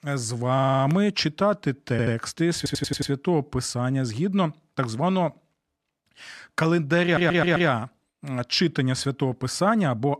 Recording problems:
audio stuttering; 4 times, first at 0.5 s

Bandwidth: 14 kHz